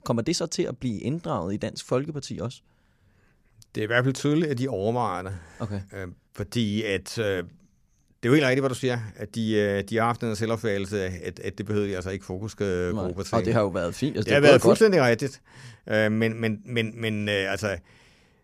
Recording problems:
none

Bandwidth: 14.5 kHz